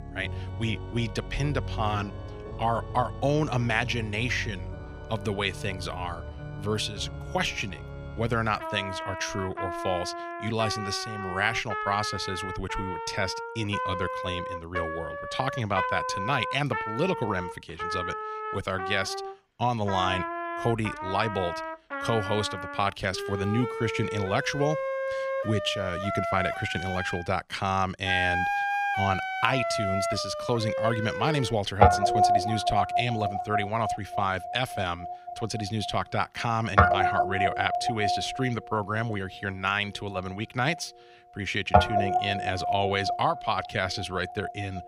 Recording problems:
background music; loud; throughout; 1 dB below the speech

